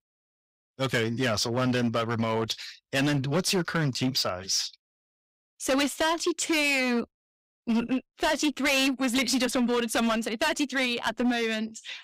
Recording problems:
distortion; heavy; 11% of the sound clipped

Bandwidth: 15.5 kHz